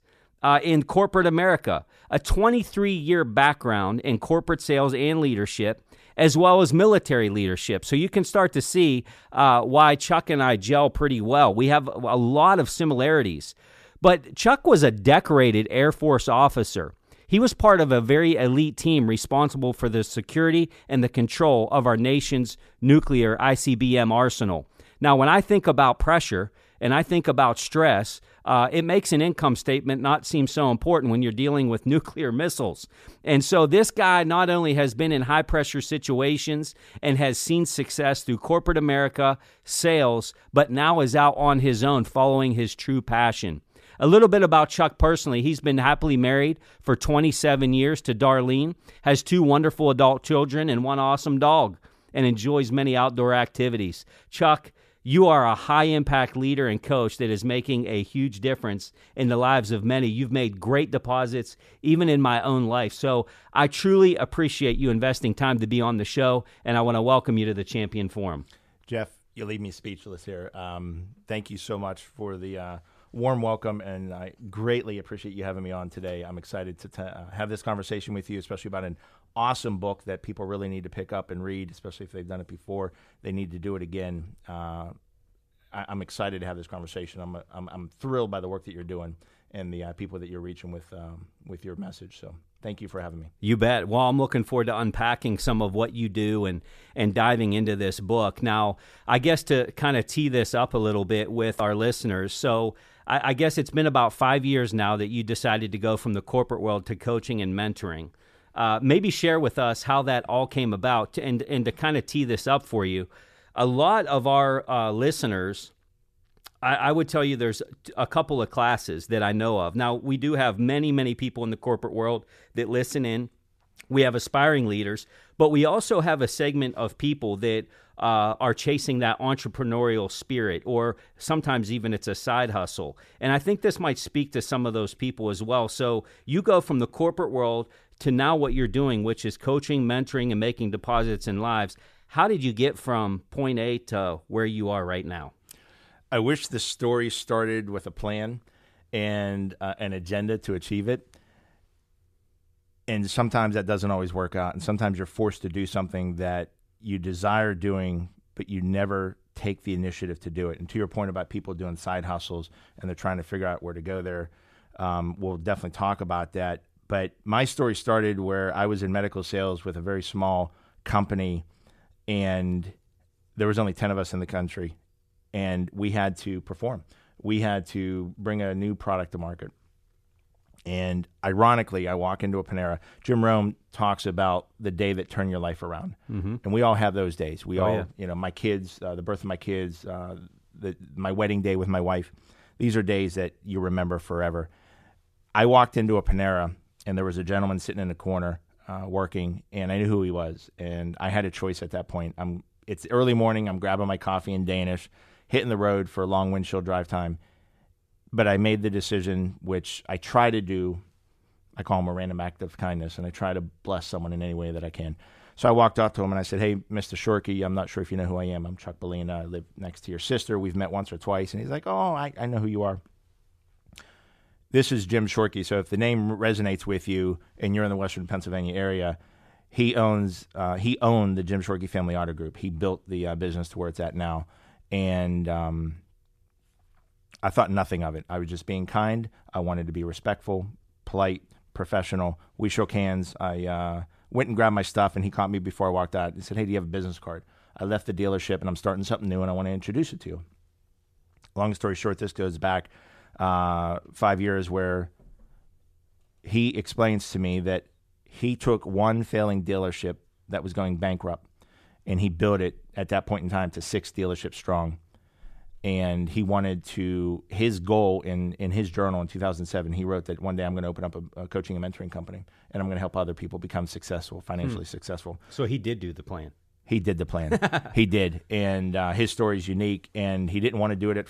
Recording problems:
none

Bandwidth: 14.5 kHz